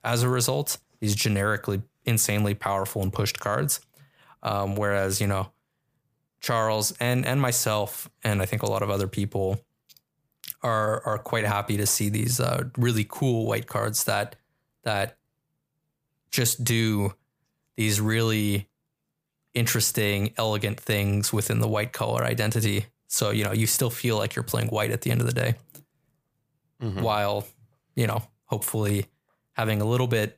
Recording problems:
none

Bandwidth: 15 kHz